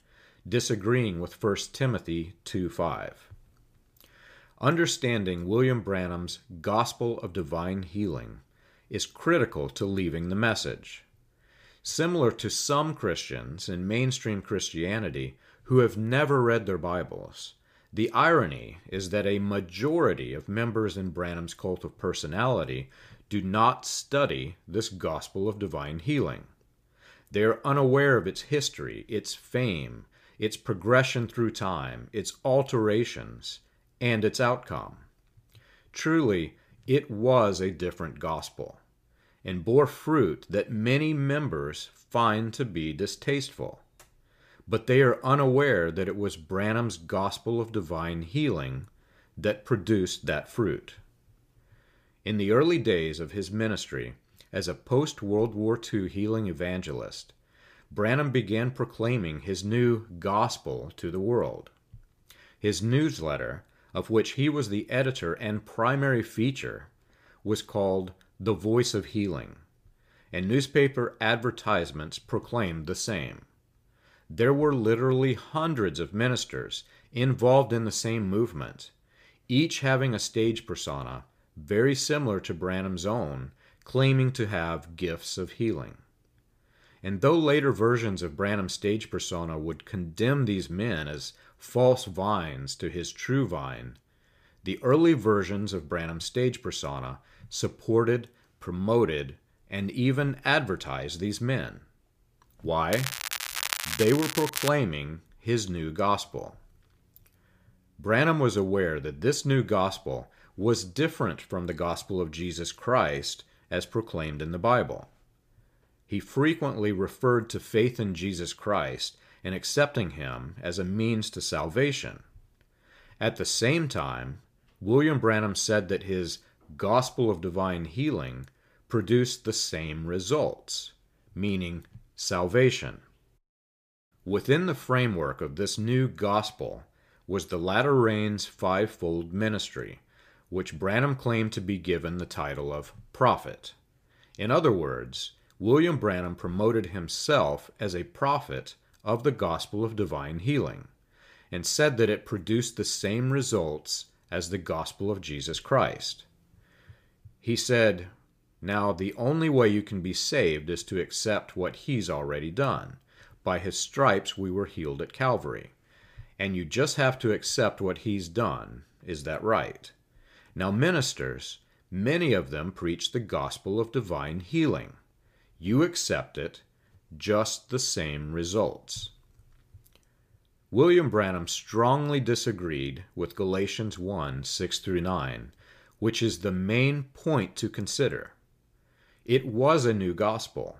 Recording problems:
crackling; loud; from 1:43 to 1:45; 4 dB below the speech

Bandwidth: 15 kHz